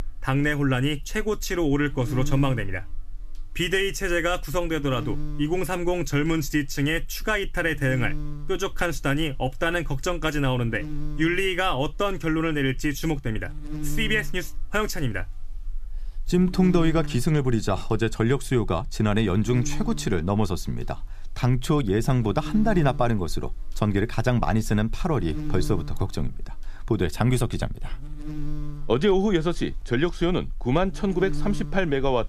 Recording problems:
electrical hum; very faint; throughout; 60 Hz, 15 dB below the speech

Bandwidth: 14.5 kHz